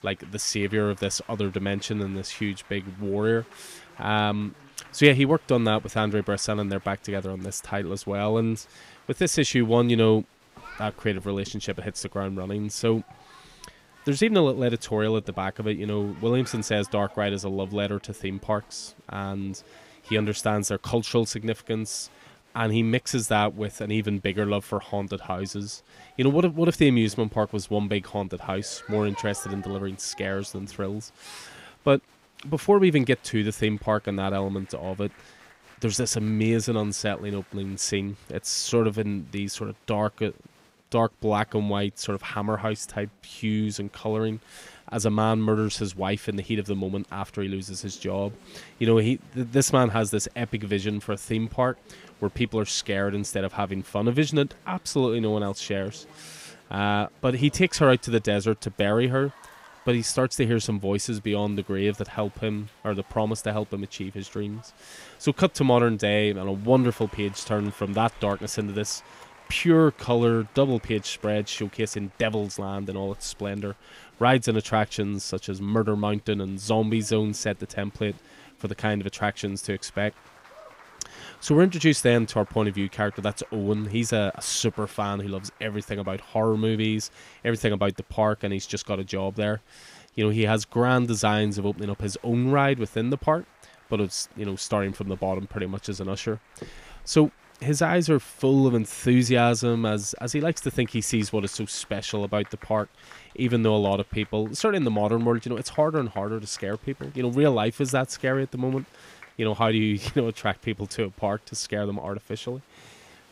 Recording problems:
crowd noise; faint; throughout; 25 dB below the speech

